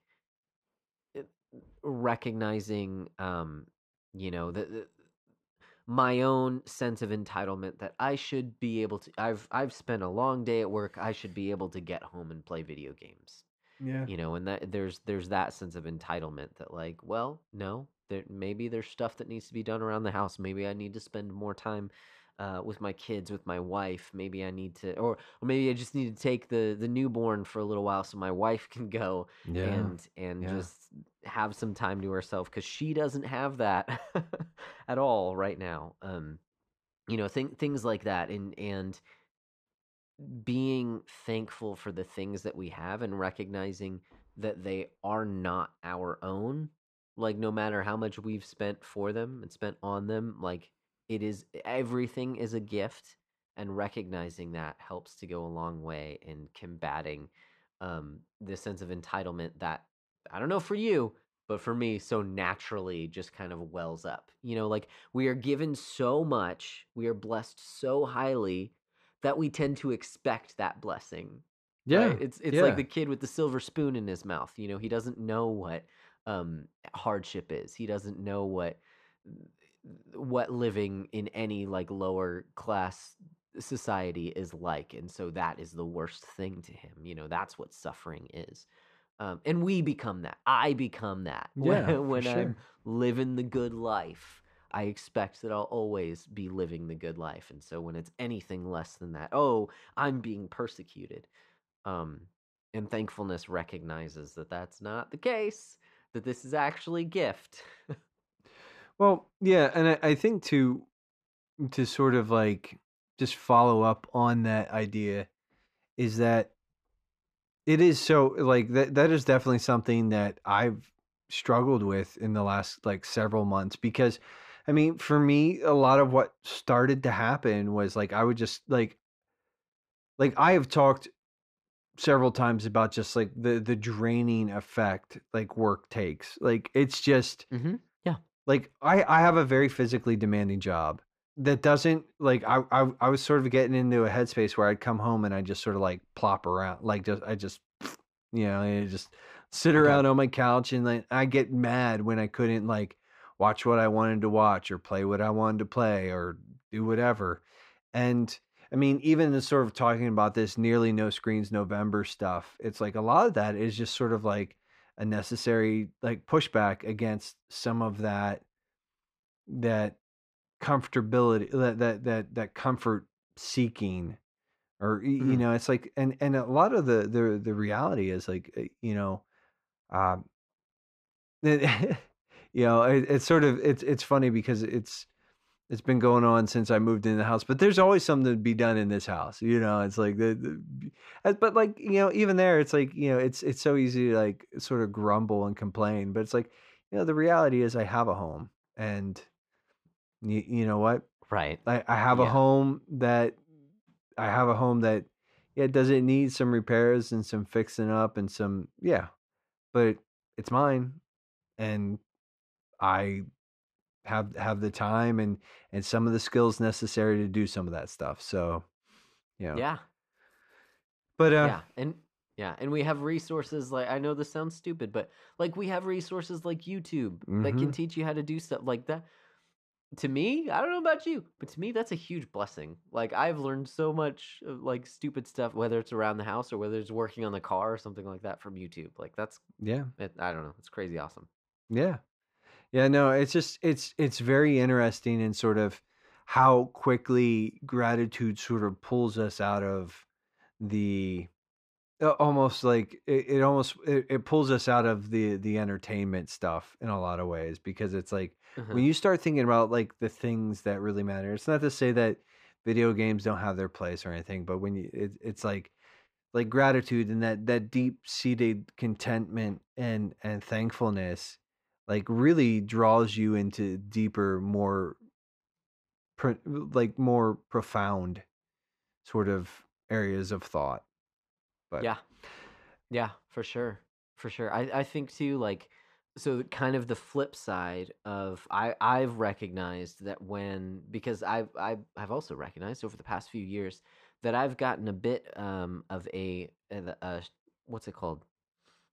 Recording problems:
muffled; slightly; fading above 2 kHz

